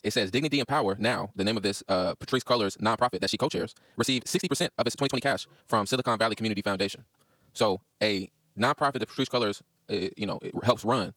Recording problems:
wrong speed, natural pitch; too fast; 1.8 times normal speed
uneven, jittery; strongly; from 3 to 9 s

